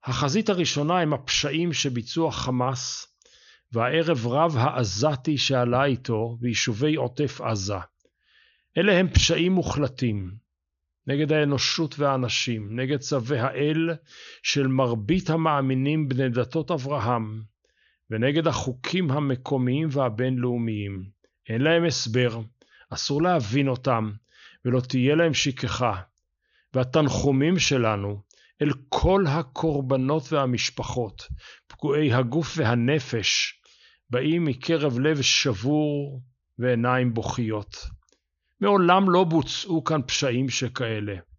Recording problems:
high frequencies cut off; noticeable; nothing above 7 kHz

